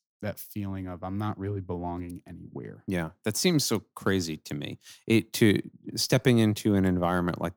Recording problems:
none

